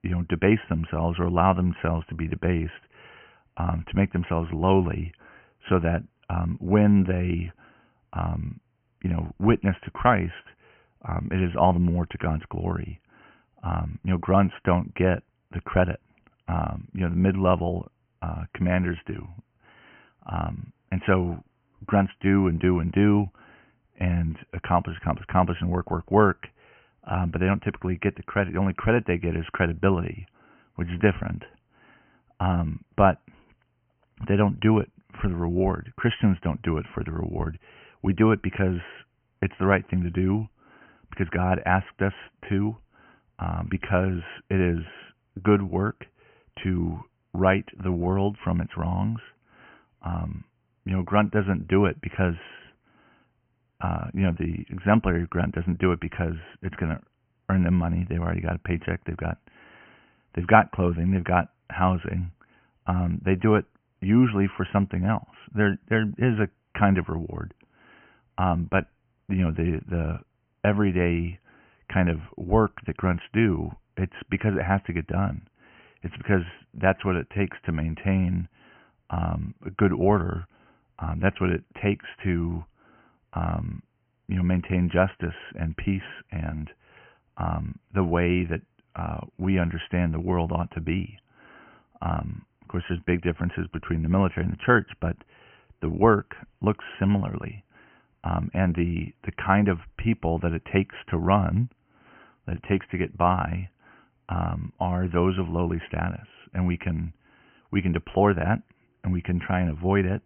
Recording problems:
high frequencies cut off; severe; nothing above 3 kHz

